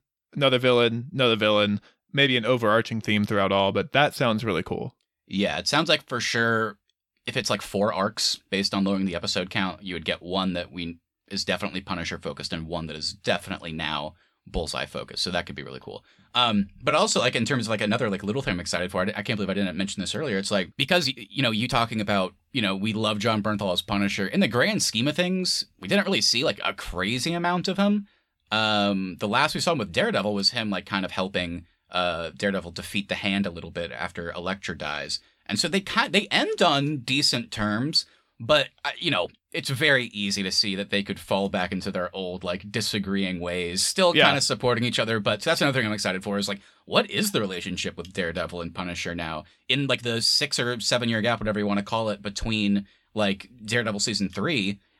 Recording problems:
uneven, jittery; strongly; from 7 to 50 s

